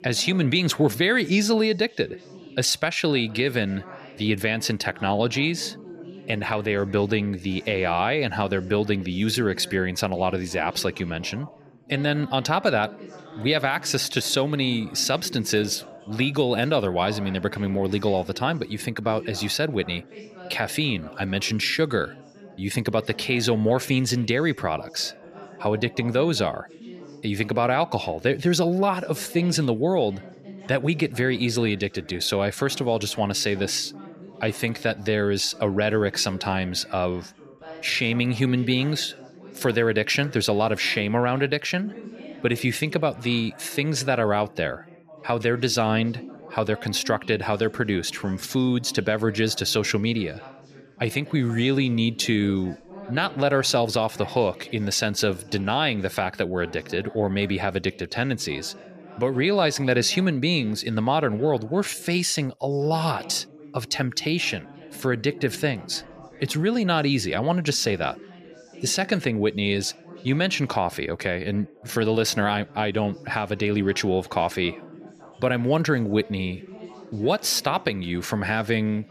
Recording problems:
background chatter; noticeable; throughout; 3 voices, 20 dB below the speech

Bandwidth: 14.5 kHz